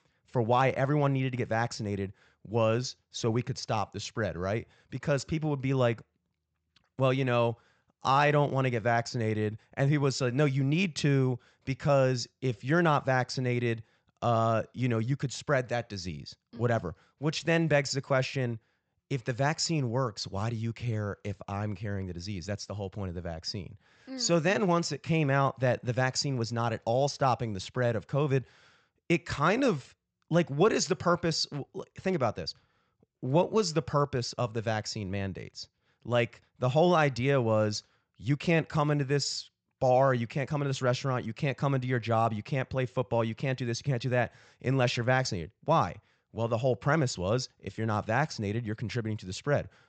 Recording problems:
high frequencies cut off; noticeable; nothing above 8 kHz

